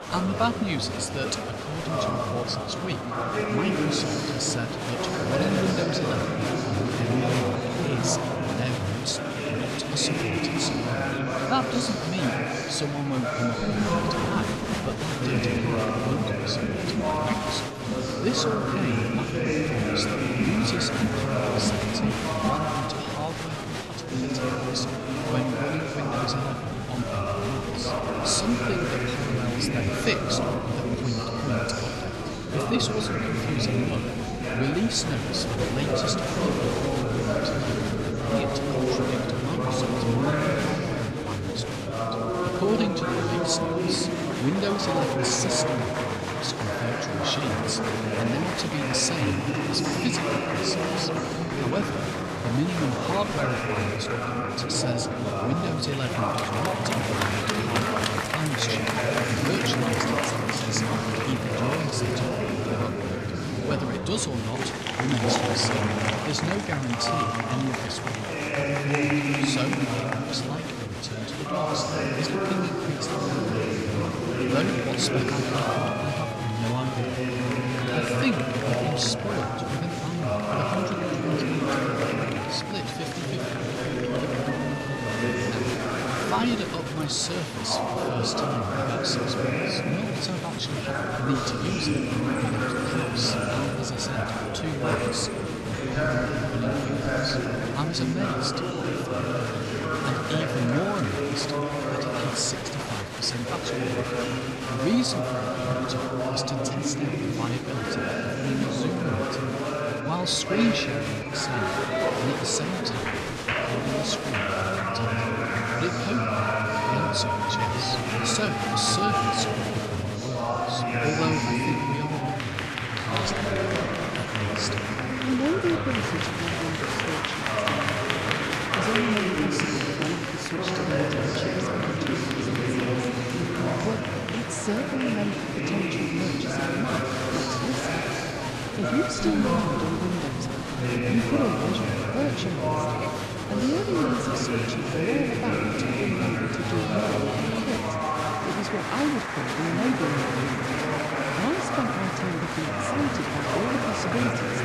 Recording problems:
murmuring crowd; very loud; throughout; 4 dB above the speech

